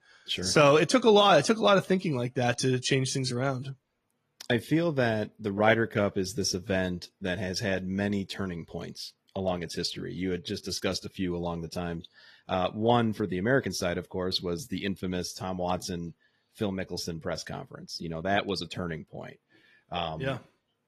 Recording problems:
garbled, watery; slightly; nothing above 14.5 kHz

